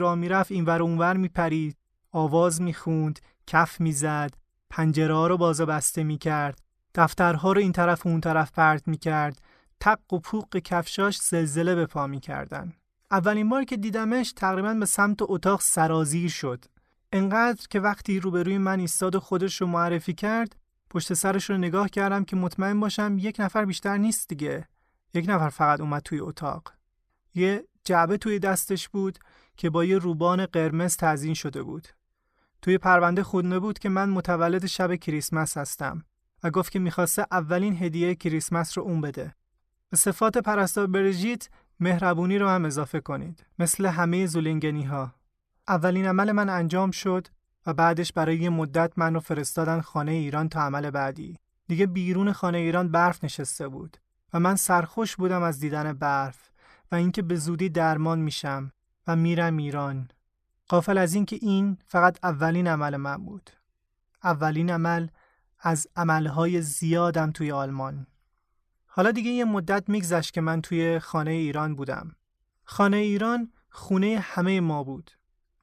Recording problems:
abrupt cut into speech; at the start

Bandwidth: 14 kHz